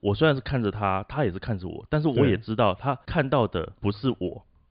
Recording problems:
high frequencies cut off; severe; nothing above 5 kHz

